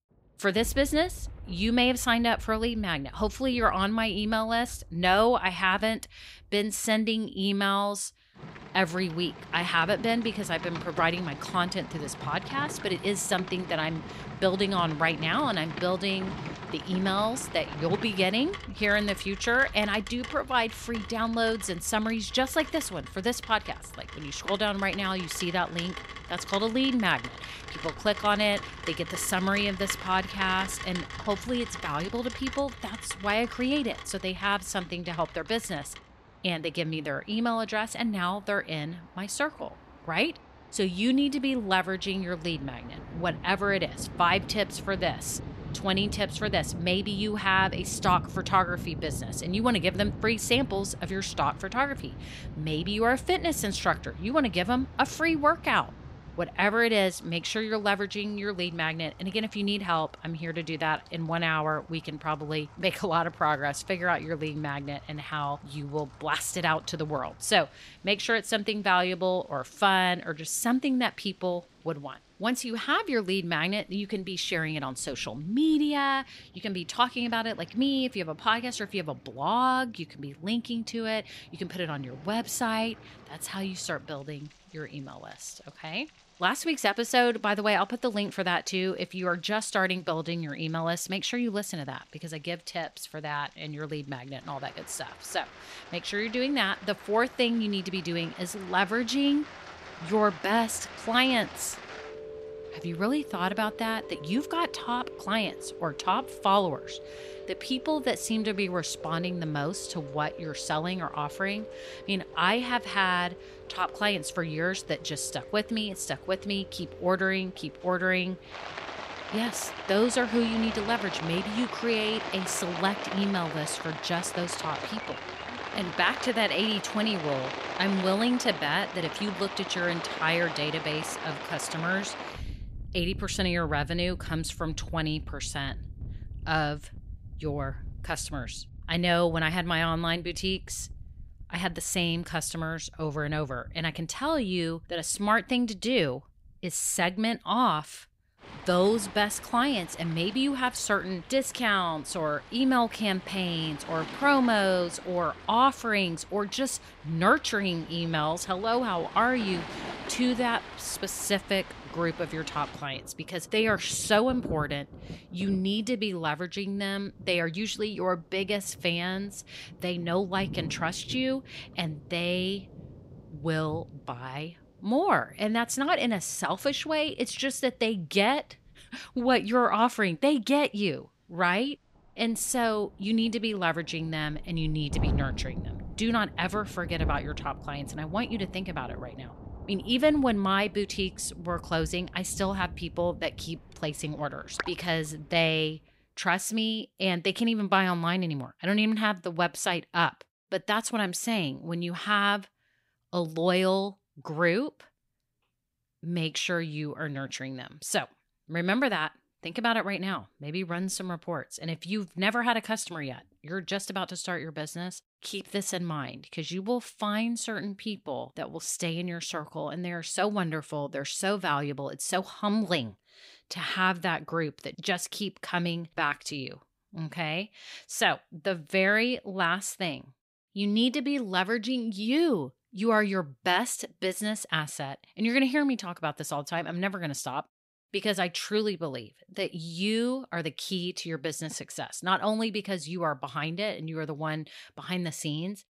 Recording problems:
rain or running water; noticeable; until 3:16; 10 dB below the speech

